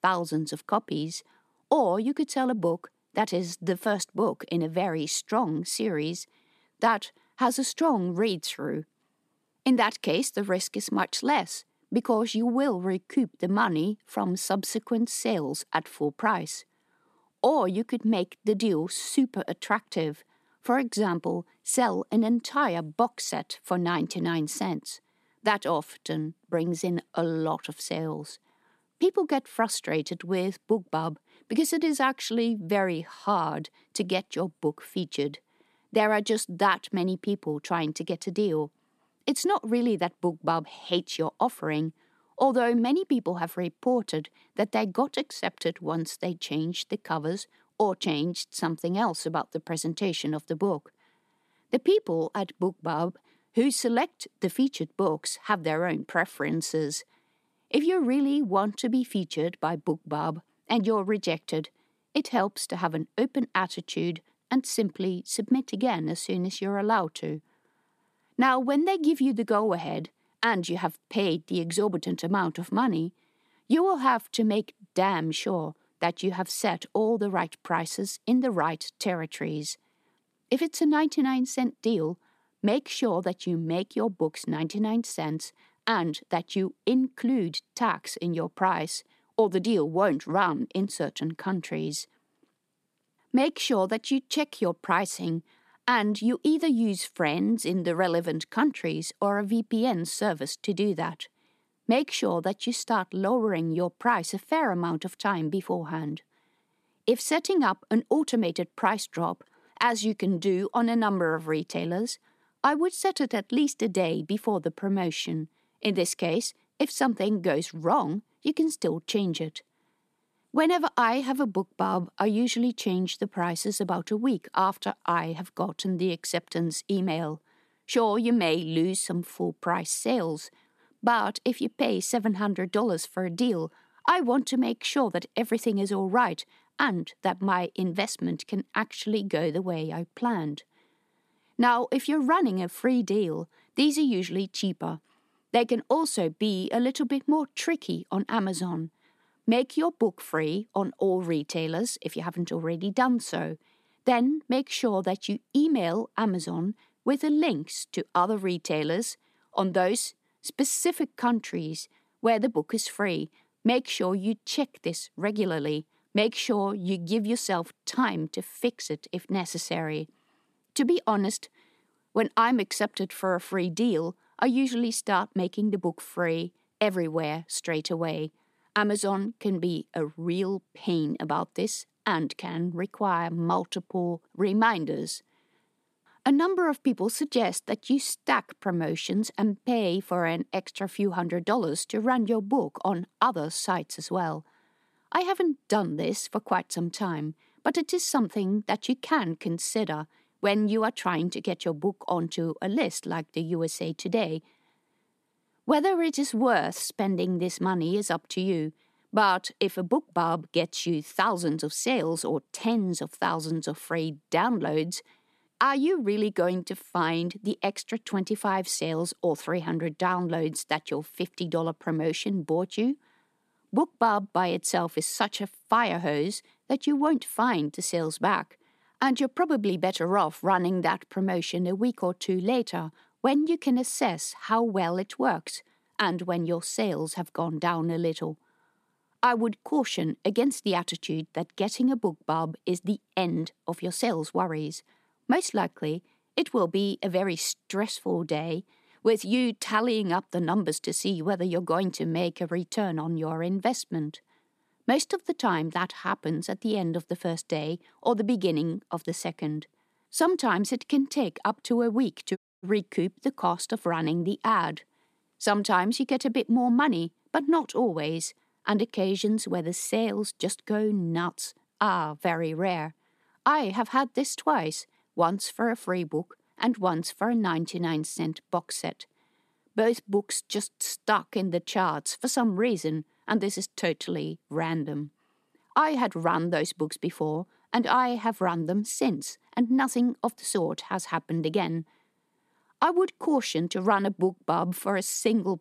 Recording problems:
audio cutting out; at 4:22

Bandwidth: 14.5 kHz